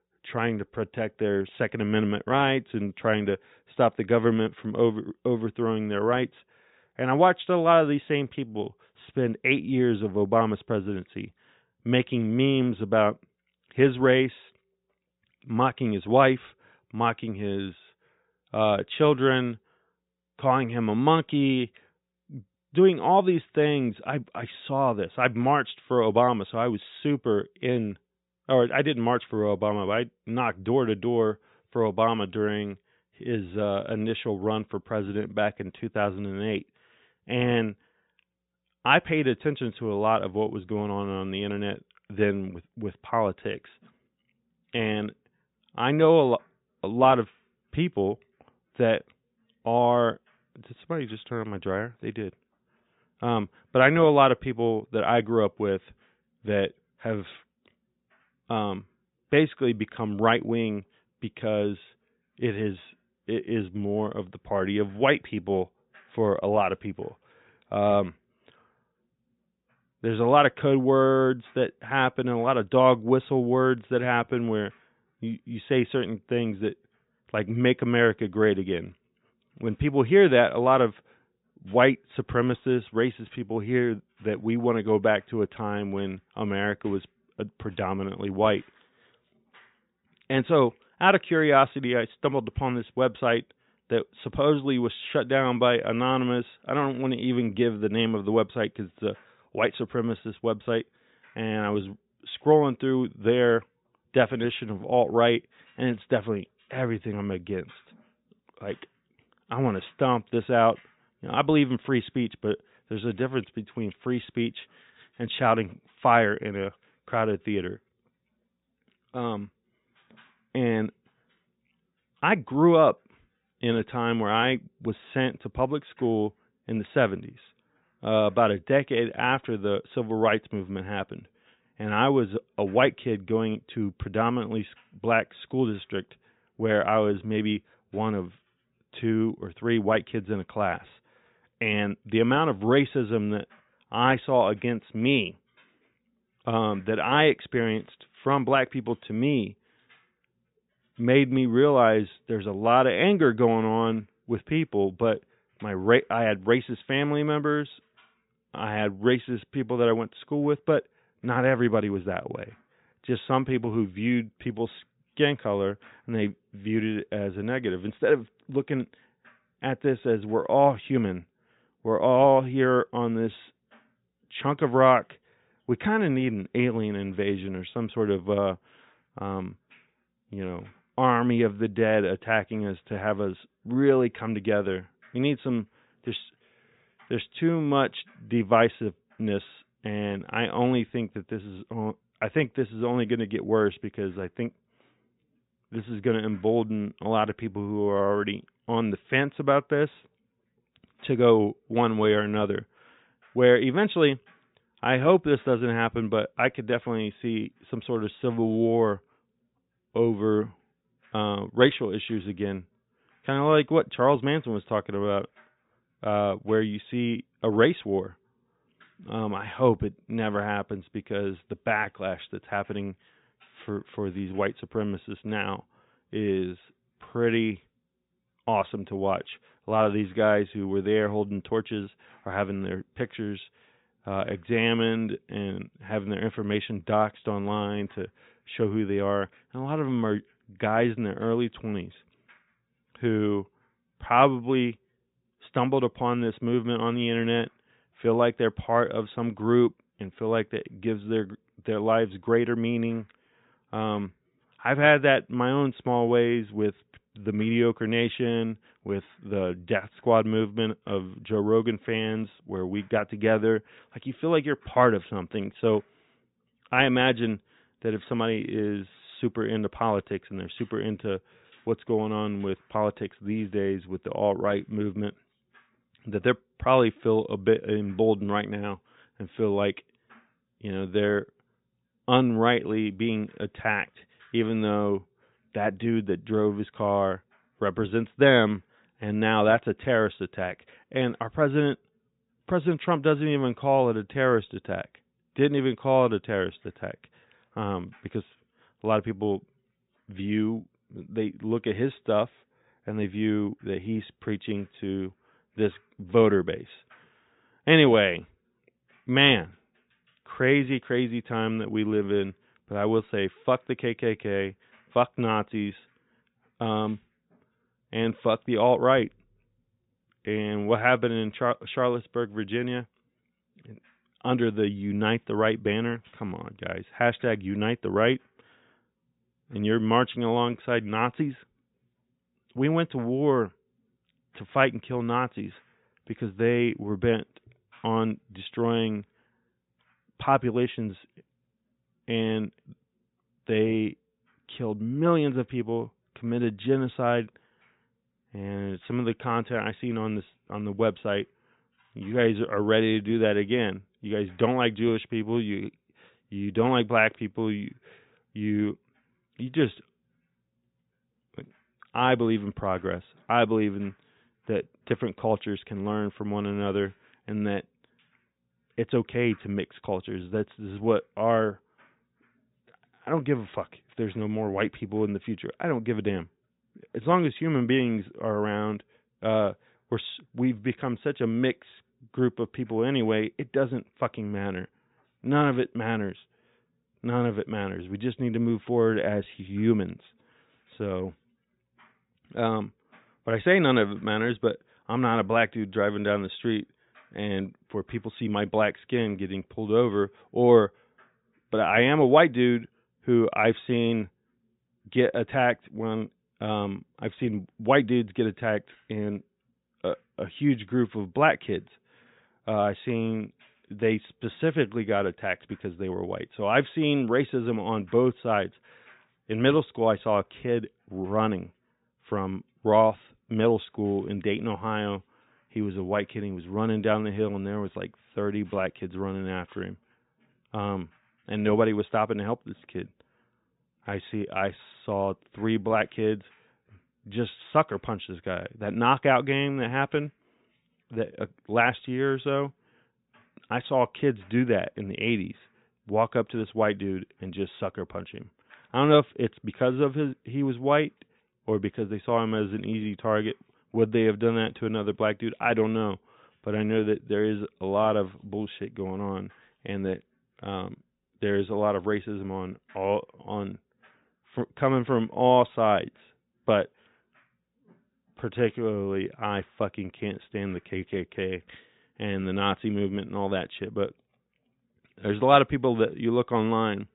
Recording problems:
high frequencies cut off; severe; nothing above 4 kHz

